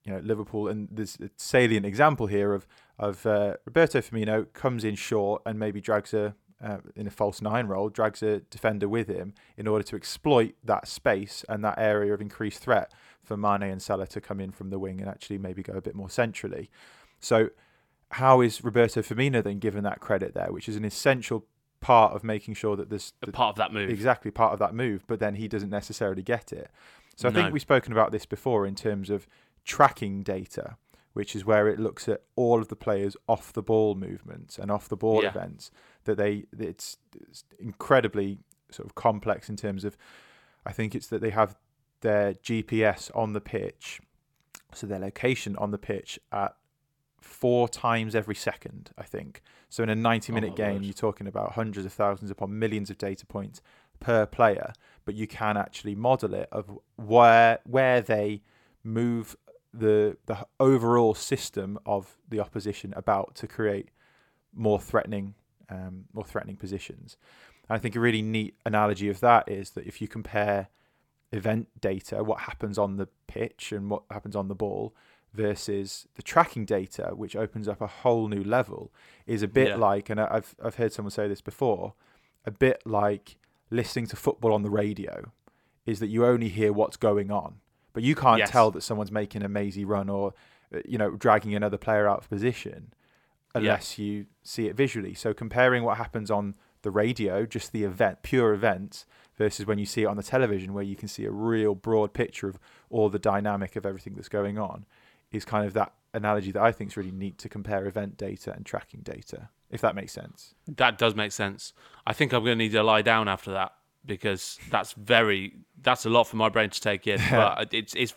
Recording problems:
none

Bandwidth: 17 kHz